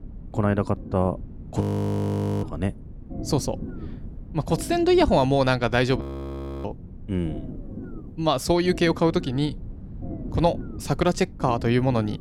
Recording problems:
low rumble; noticeable; throughout; 20 dB below the speech
audio freezing; at 1.5 s for 1 s and at 6 s for 0.5 s

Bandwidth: 16.5 kHz